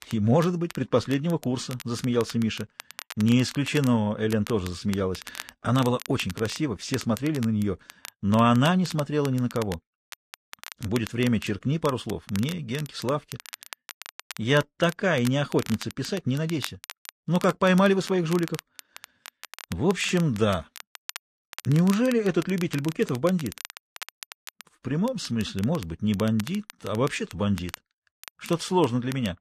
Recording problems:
crackle, like an old record; noticeable; 15 dB below the speech

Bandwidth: 14 kHz